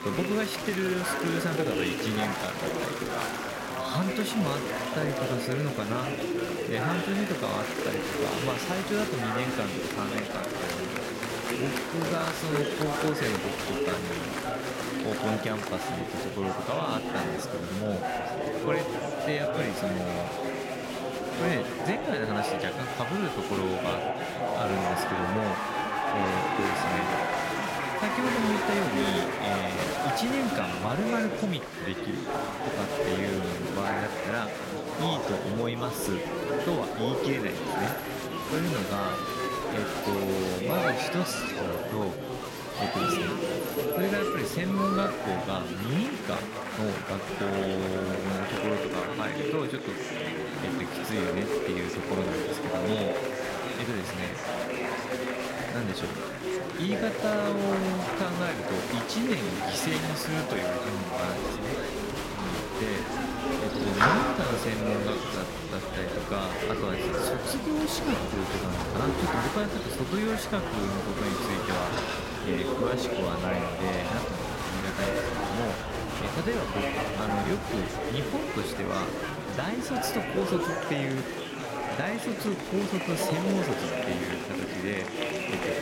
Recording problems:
chatter from many people; very loud; throughout; 2 dB above the speech

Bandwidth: 16 kHz